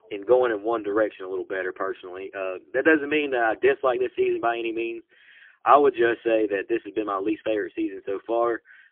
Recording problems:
phone-call audio; poor line

